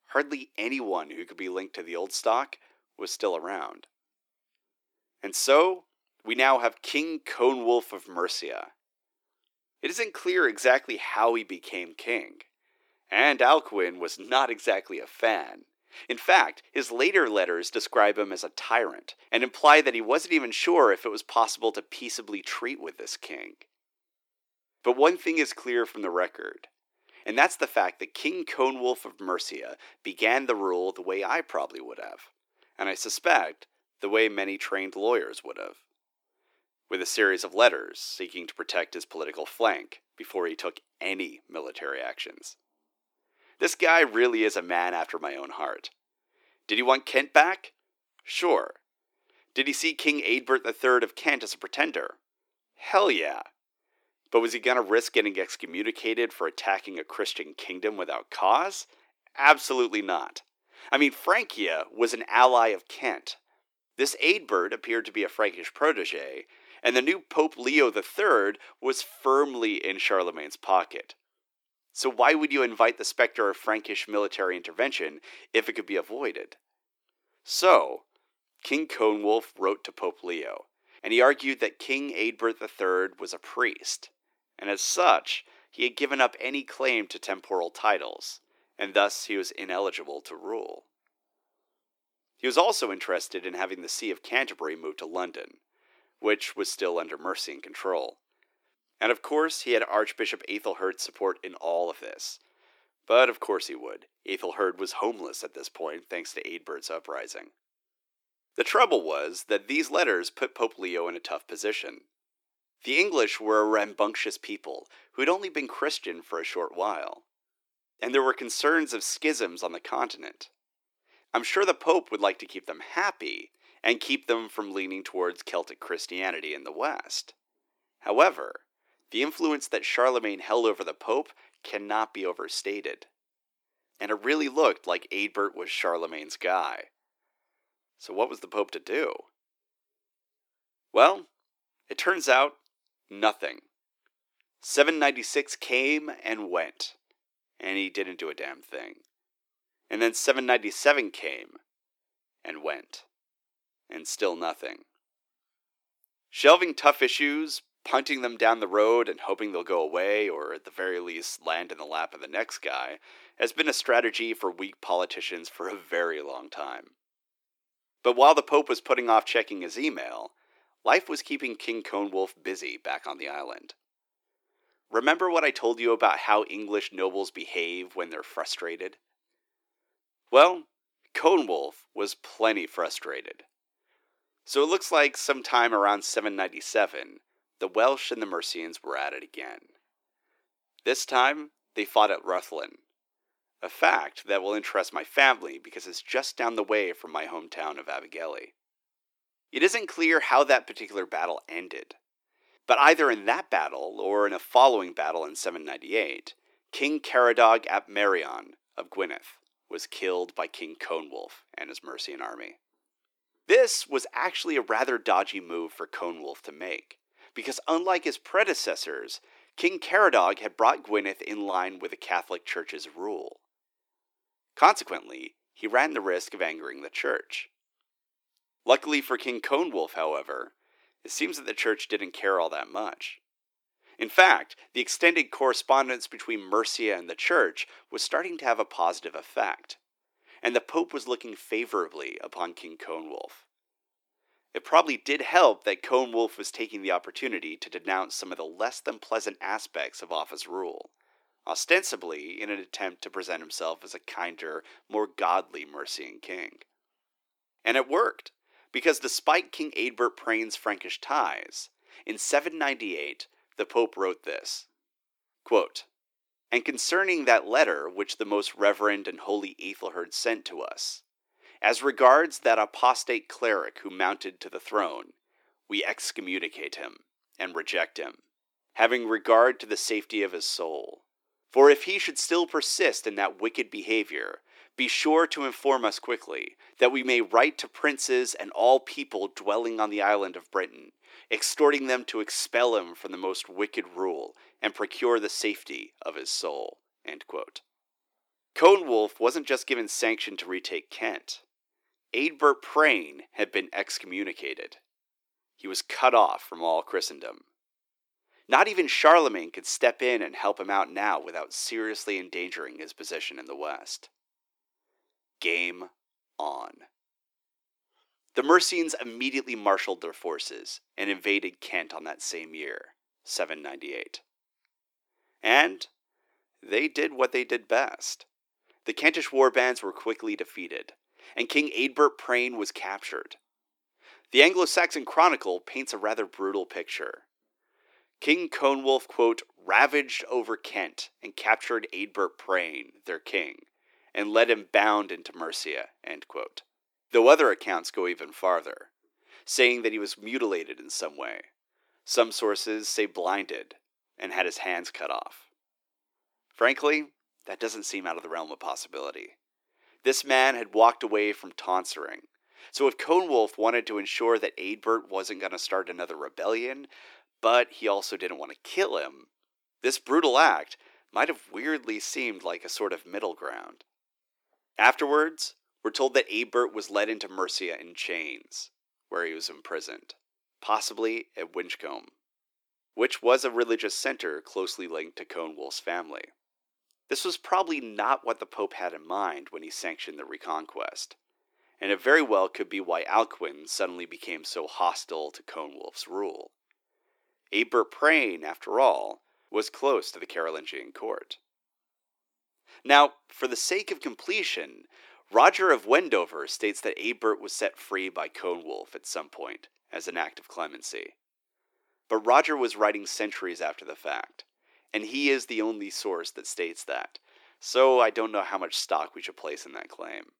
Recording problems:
thin; somewhat; fading below 300 Hz

